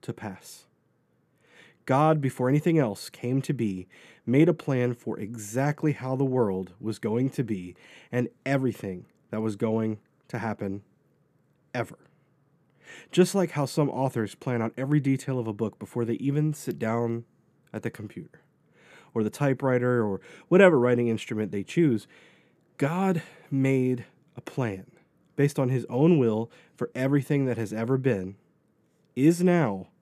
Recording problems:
none

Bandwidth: 14.5 kHz